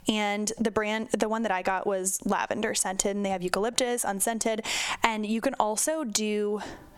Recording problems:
squashed, flat; heavily

